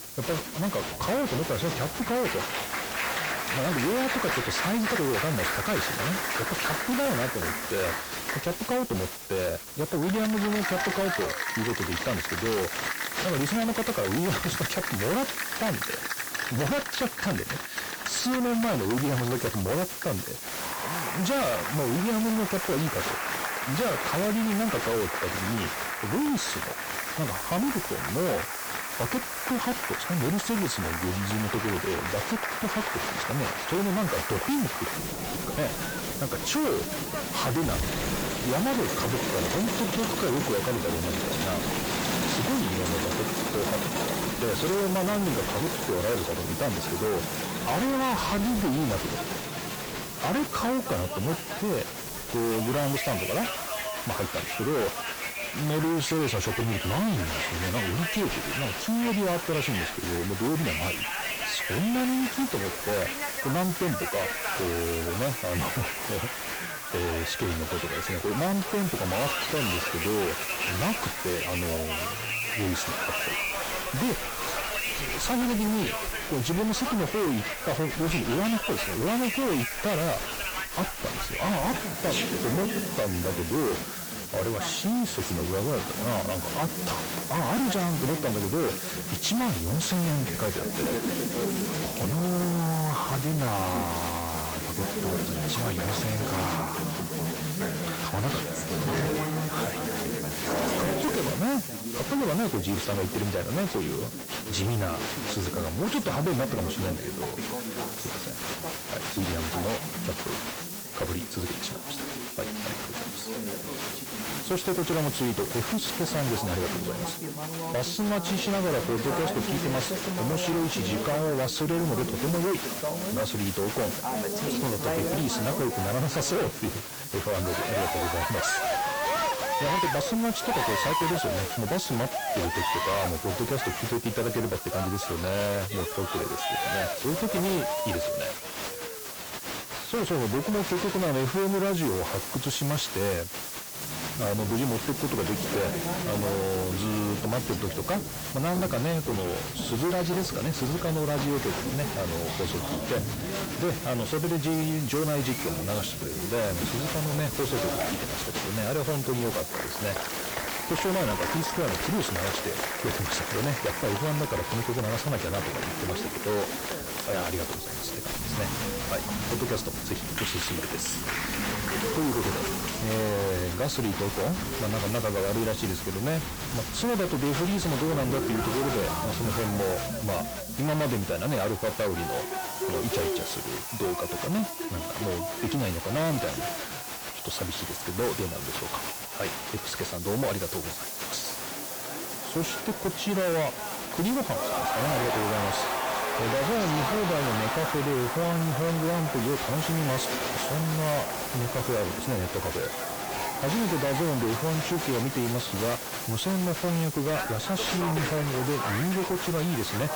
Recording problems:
distortion; heavy; 6 dB below the speech
garbled, watery; slightly; nothing above 8 kHz
crowd noise; loud; throughout; 3 dB below the speech
hiss; loud; throughout; 7 dB below the speech

